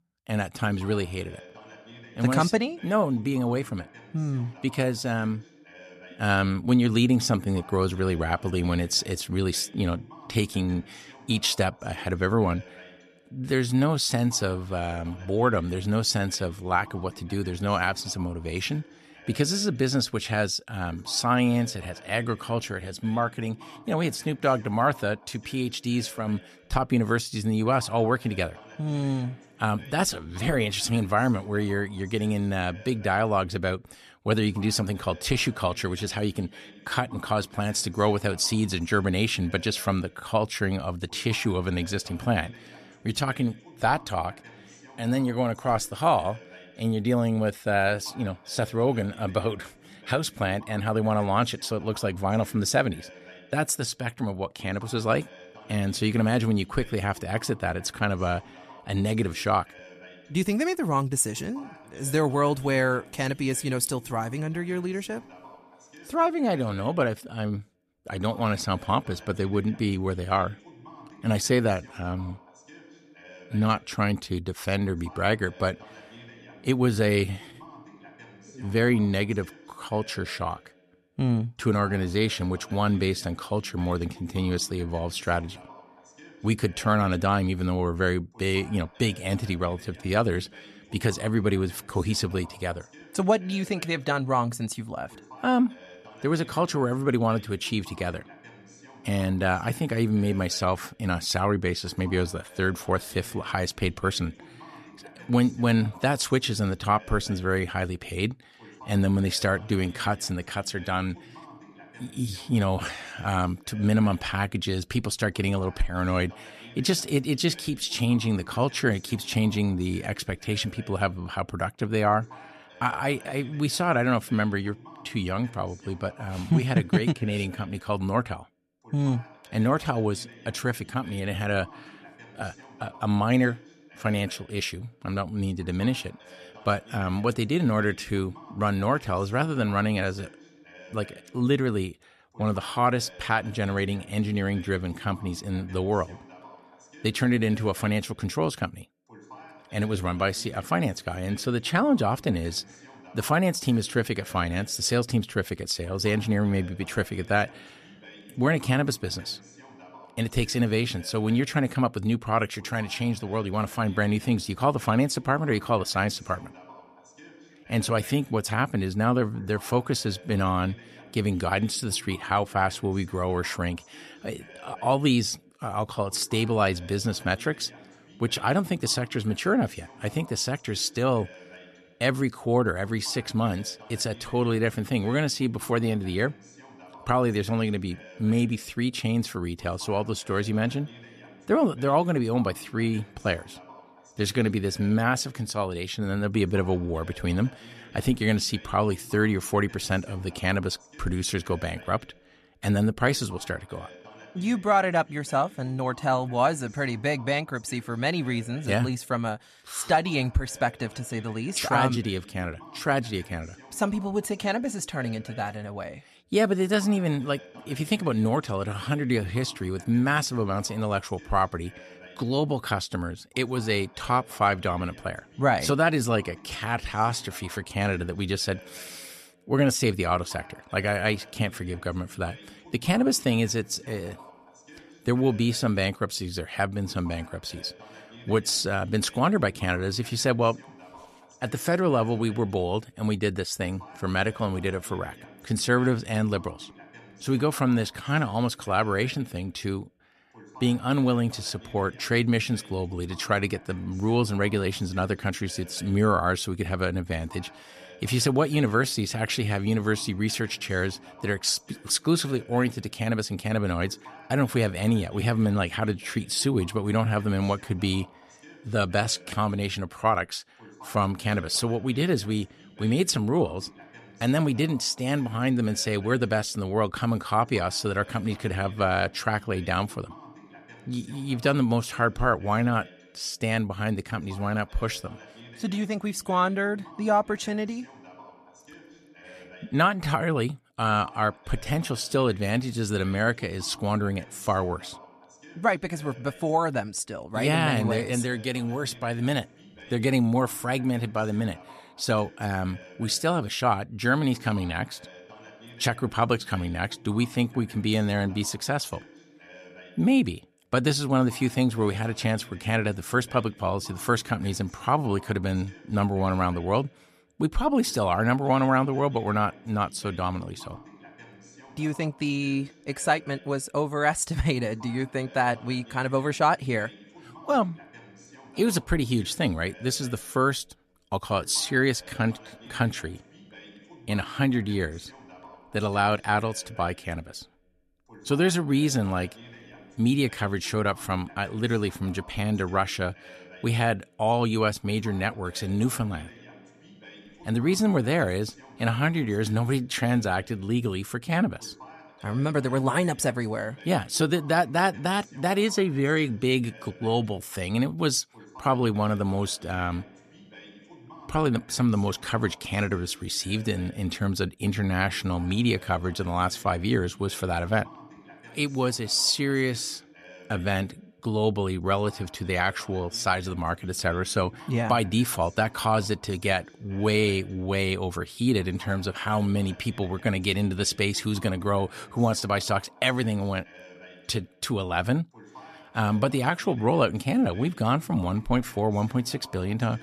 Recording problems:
voice in the background; faint; throughout; 20 dB below the speech

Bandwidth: 14 kHz